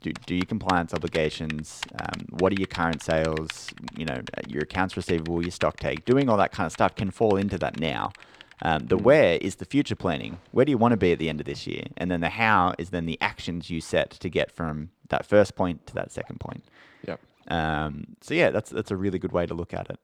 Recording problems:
household noises; noticeable; throughout; 15 dB below the speech

